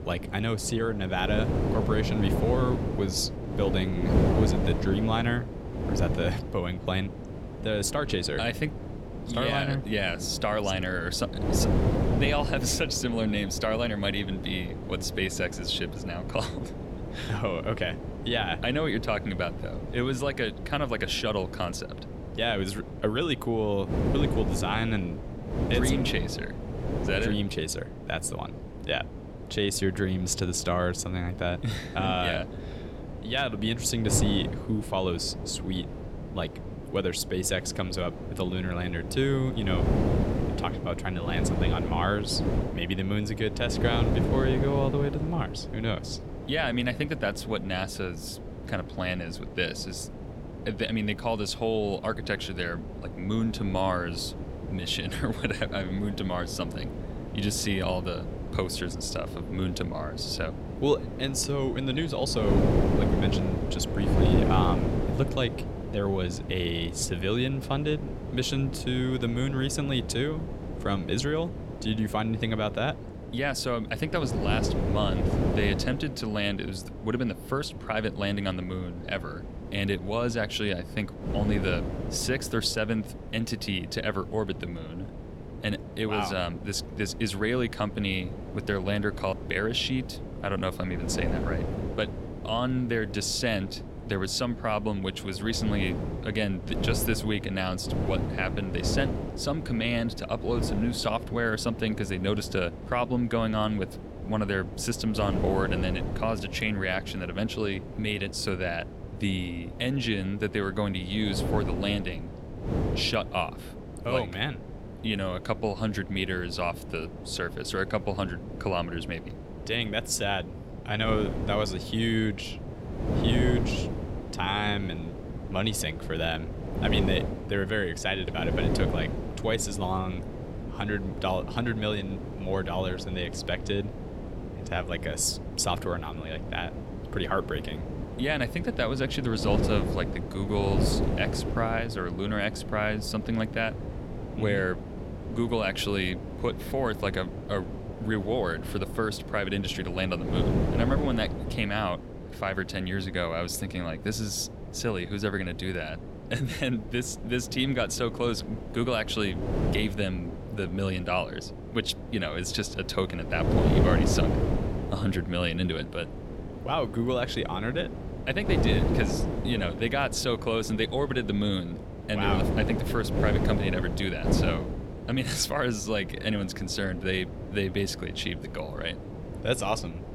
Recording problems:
wind noise on the microphone; heavy; 8 dB below the speech

